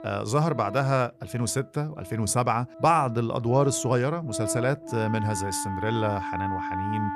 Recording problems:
background music; loud; throughout; 9 dB below the speech

